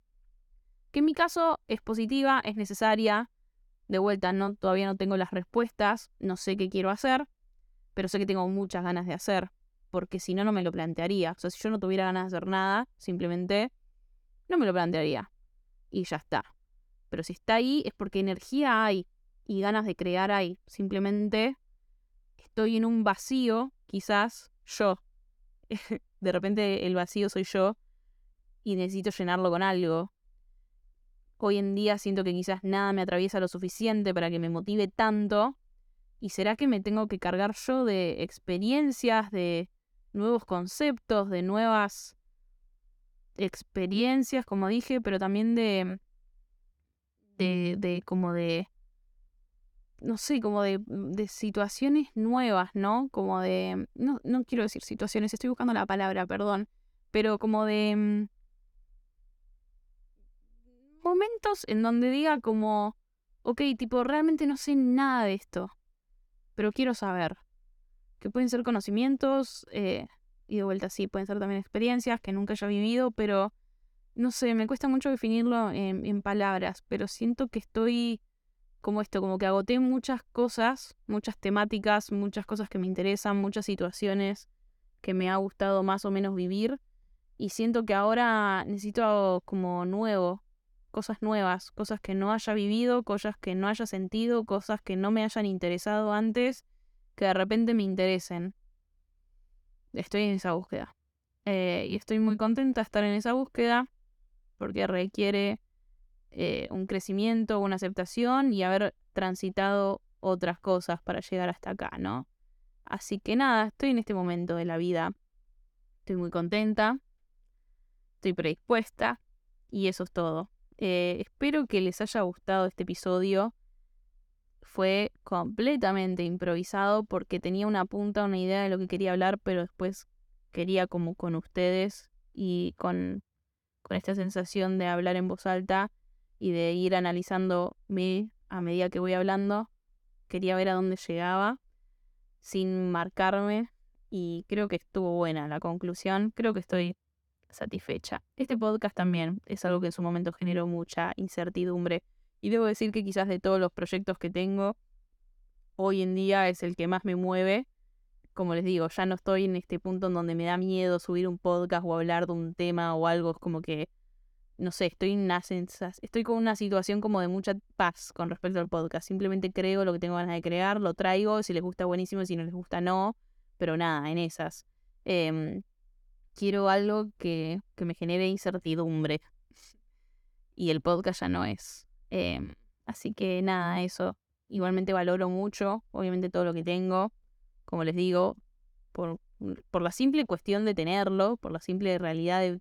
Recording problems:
none

